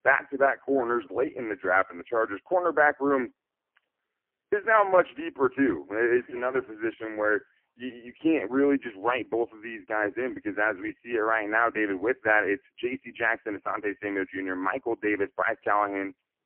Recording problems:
phone-call audio; poor line

